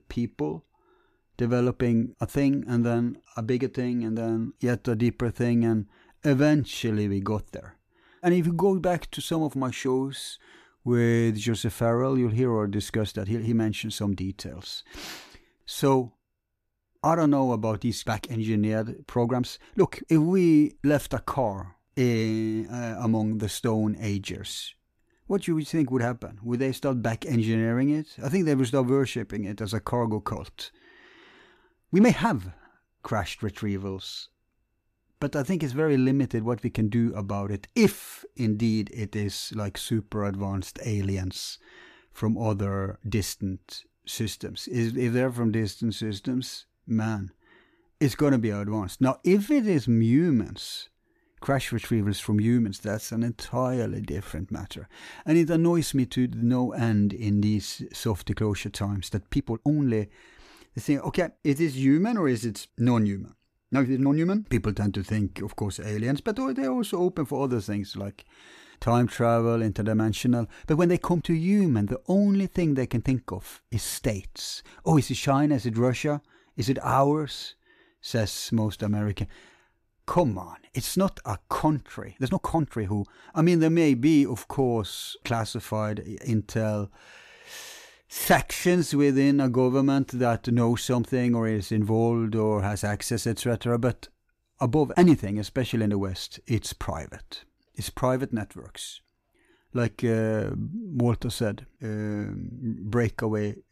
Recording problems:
uneven, jittery; strongly; from 6 s to 1:41

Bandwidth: 14.5 kHz